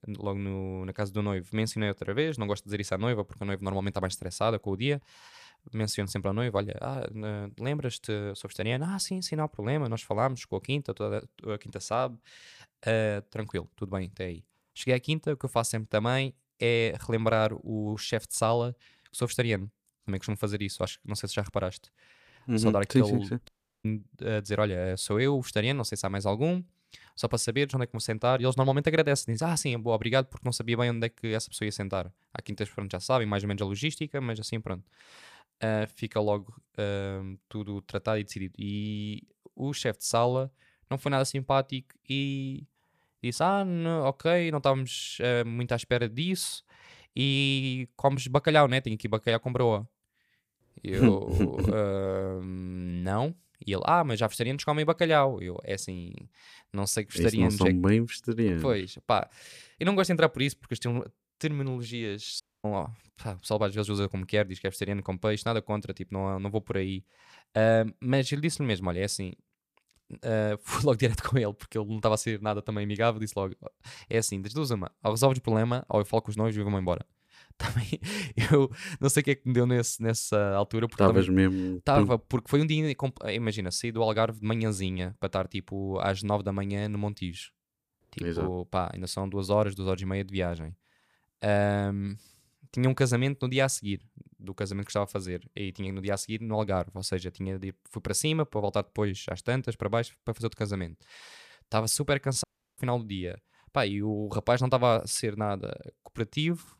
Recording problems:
audio cutting out; at 23 s, at 1:02 and at 1:42

